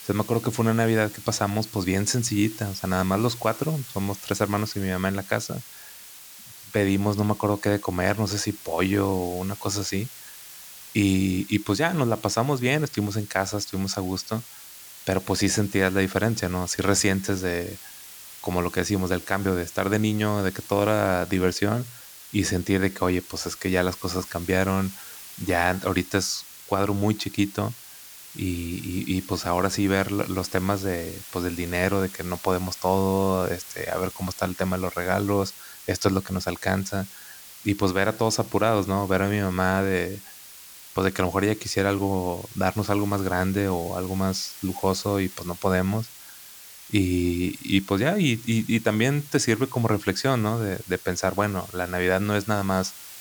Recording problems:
hiss; noticeable; throughout; 15 dB below the speech

